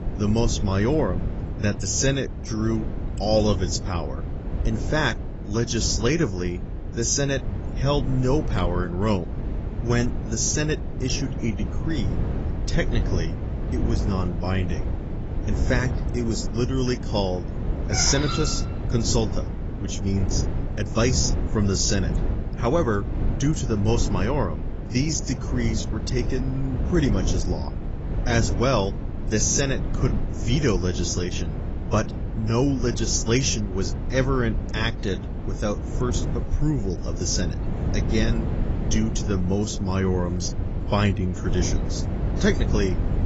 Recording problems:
garbled, watery; badly; nothing above 7.5 kHz
animal sounds; noticeable; from 16 s on; 15 dB below the speech
wind noise on the microphone; occasional gusts; 10 dB below the speech

